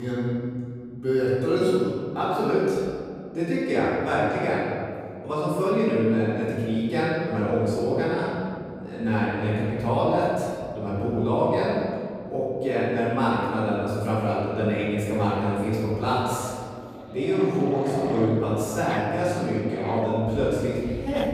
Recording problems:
room echo; strong; dies away in 2.1 s
off-mic speech; far
animal sounds; very faint; from 7.5 s on; 15 dB below the speech
abrupt cut into speech; at the start

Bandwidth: 15.5 kHz